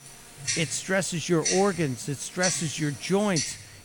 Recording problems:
household noises; loud; throughout; 4 dB below the speech

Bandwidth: 18.5 kHz